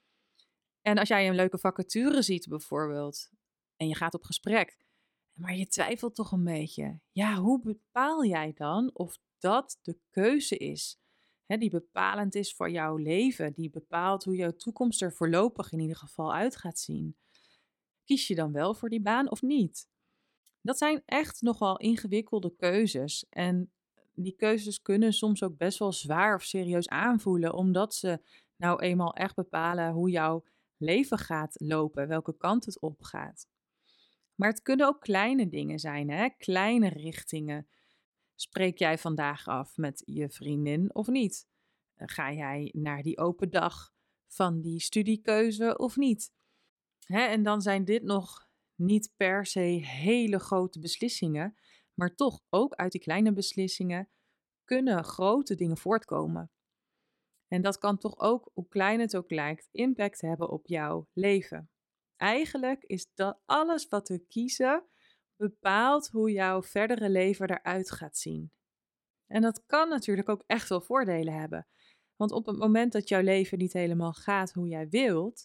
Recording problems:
uneven, jittery; strongly; from 0.5 s to 1:10

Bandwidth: 17 kHz